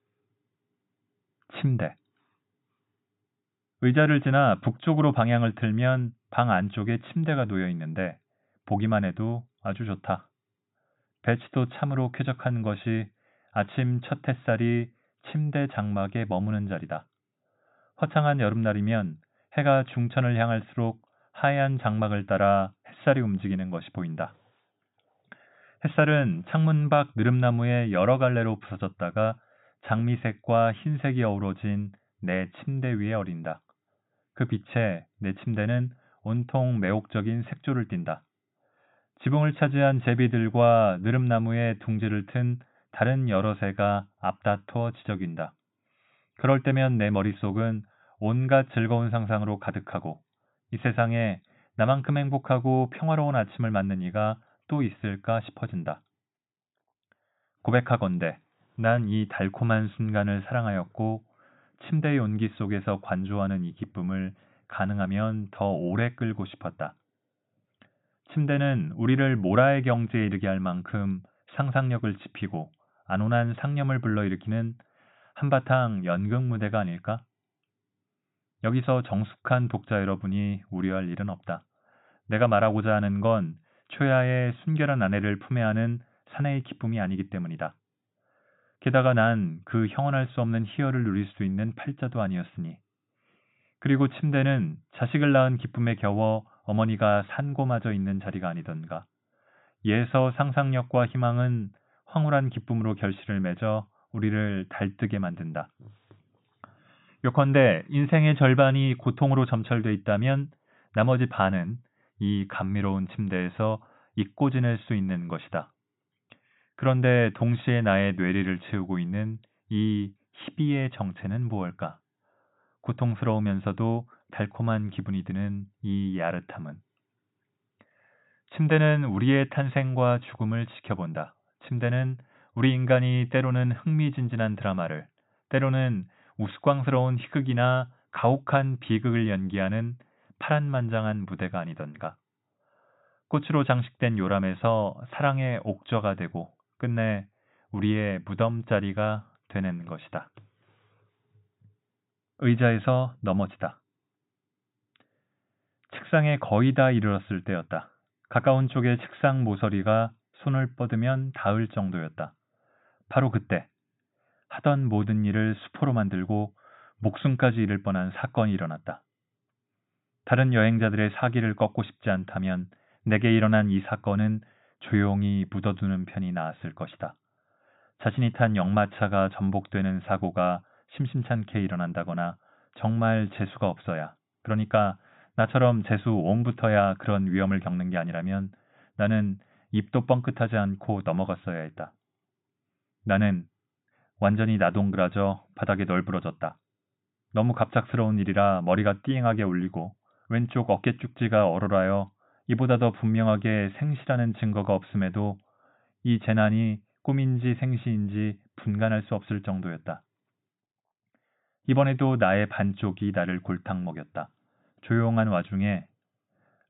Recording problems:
high frequencies cut off; severe; nothing above 4 kHz

